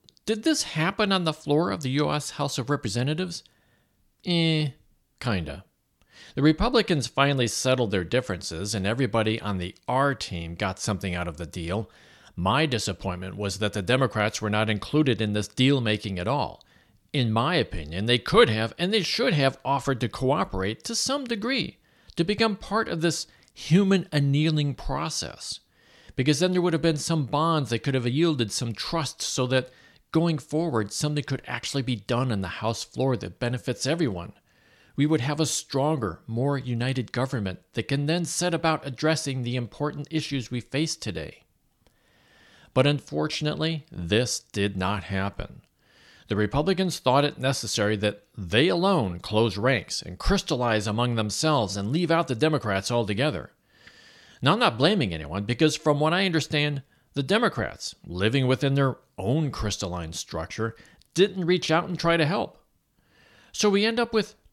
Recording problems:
none

